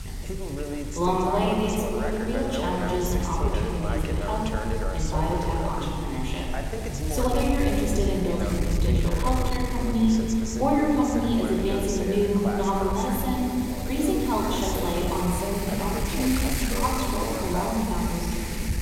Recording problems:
room echo; noticeable; dies away in 2.5 s
off-mic speech; somewhat distant
voice in the background; loud; throughout; 8 dB below the speech
wind noise on the microphone; occasional gusts; 10 dB below the speech

